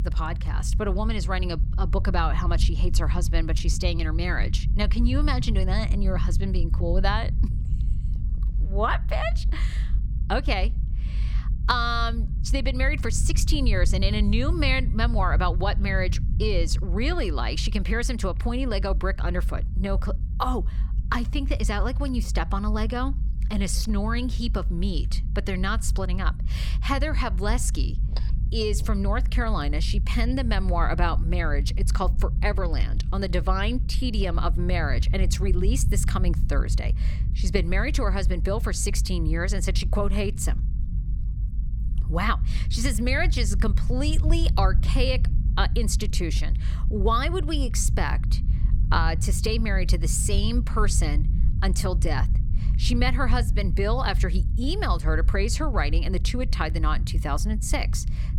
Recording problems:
low rumble; noticeable; throughout; 15 dB below the speech

